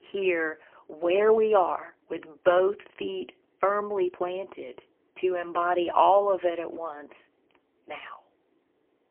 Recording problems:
phone-call audio; poor line; nothing above 3 kHz

